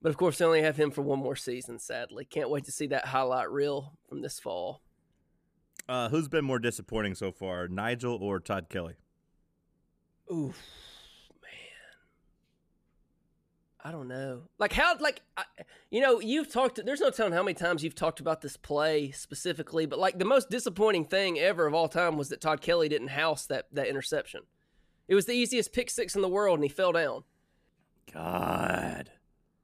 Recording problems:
none

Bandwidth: 14.5 kHz